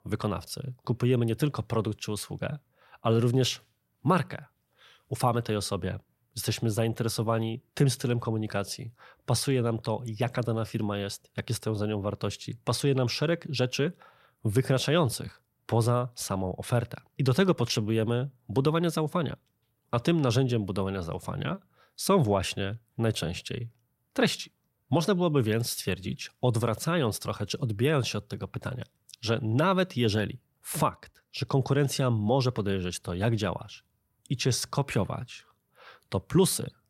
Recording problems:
none

